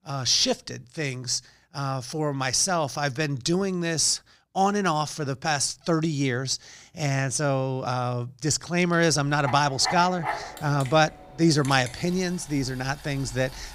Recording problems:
household noises; noticeable; from 9 s on; 15 dB below the speech

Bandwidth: 15.5 kHz